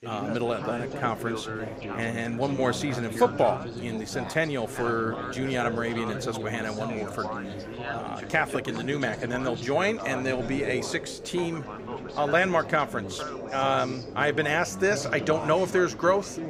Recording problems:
background chatter; loud; throughout; 4 voices, 8 dB below the speech

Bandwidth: 15.5 kHz